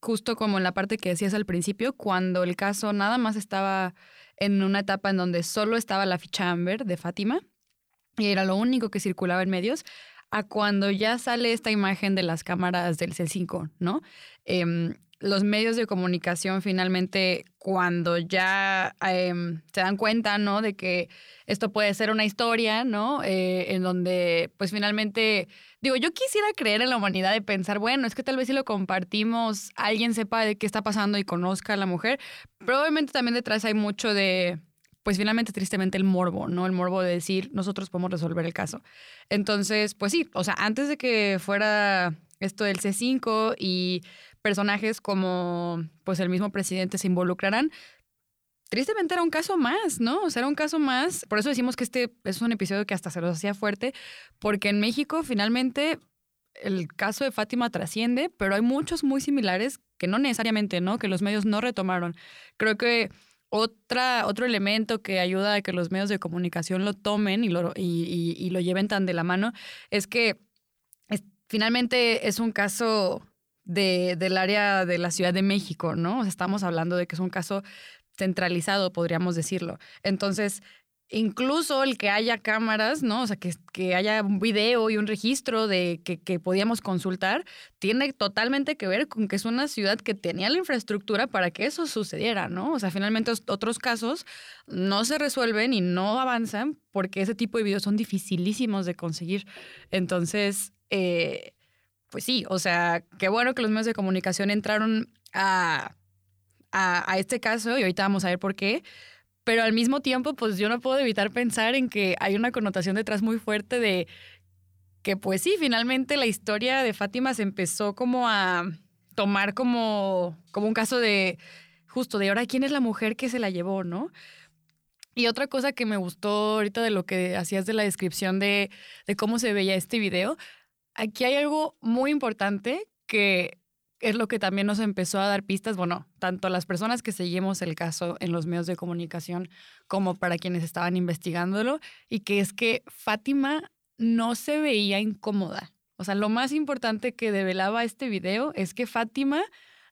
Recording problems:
uneven, jittery; strongly; from 8 s to 2:13

